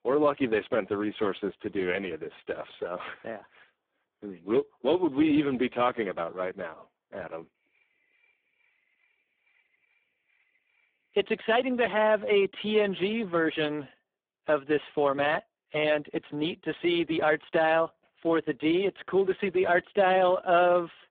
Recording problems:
phone-call audio; poor line

